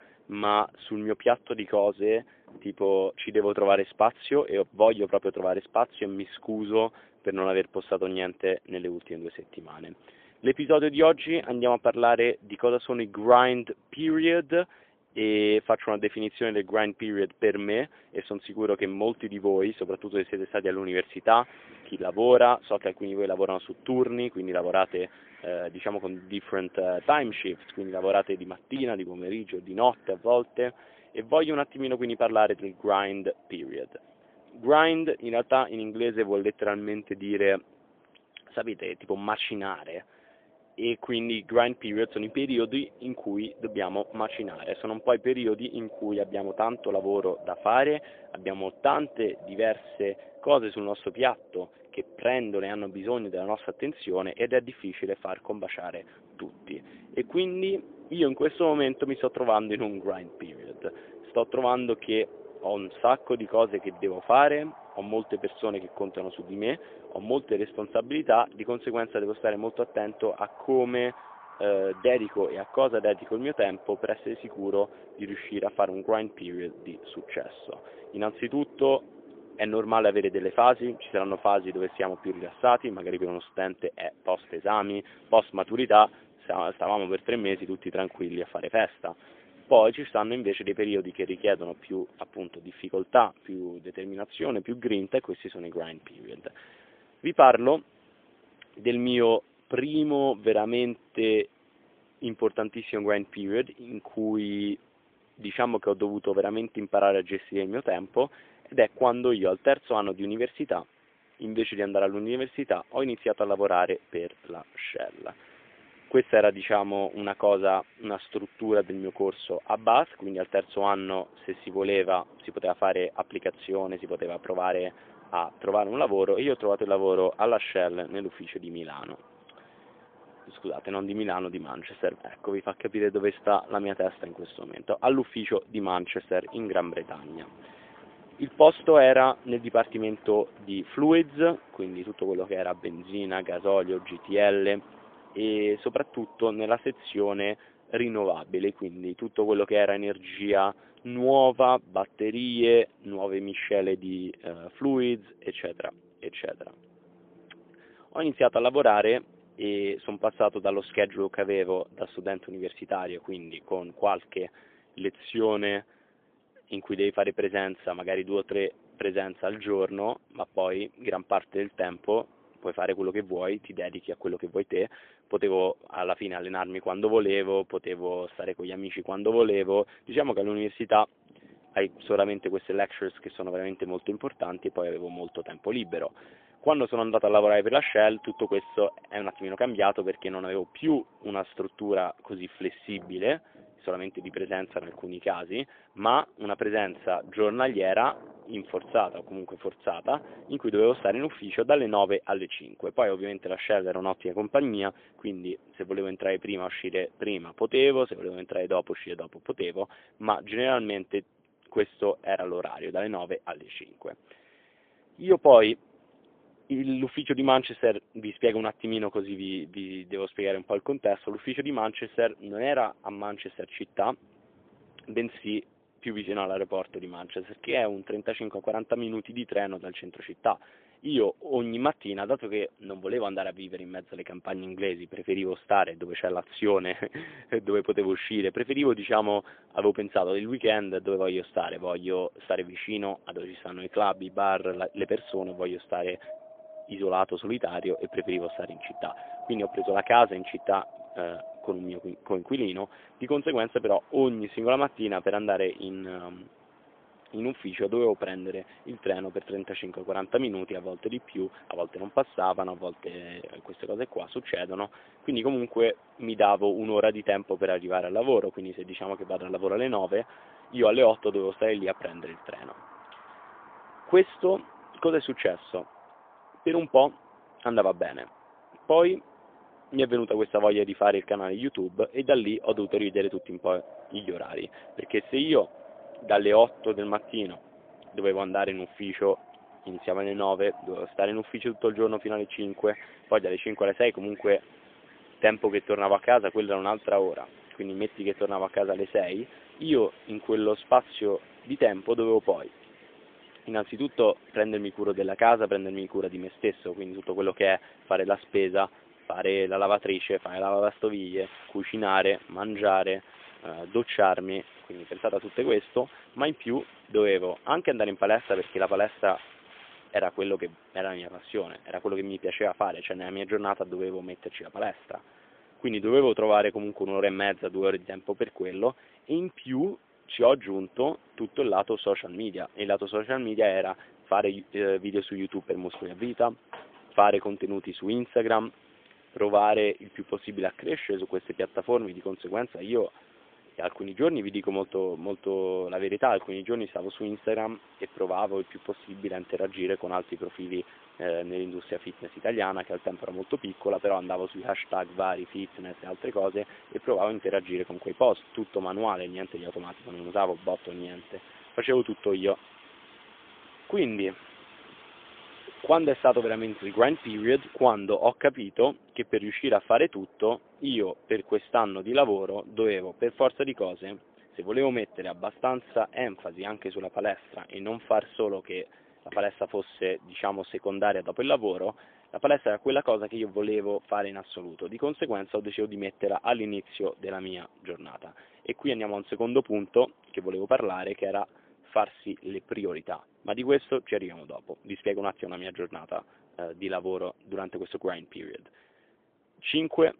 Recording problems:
phone-call audio; poor line; nothing above 3.5 kHz
wind in the background; faint; throughout; 25 dB below the speech

